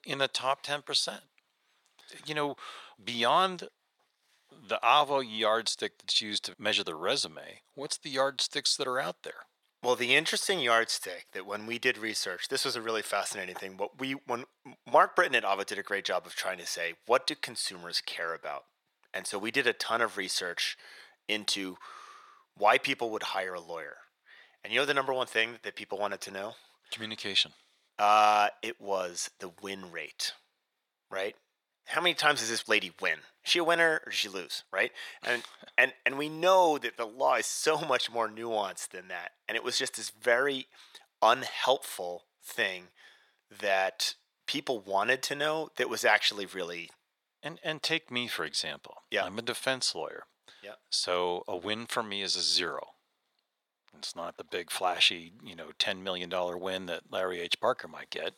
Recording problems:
thin; very; fading below 600 Hz

